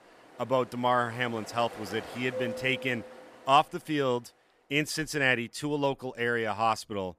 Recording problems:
rain or running water; noticeable; throughout; 15 dB below the speech

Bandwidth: 14.5 kHz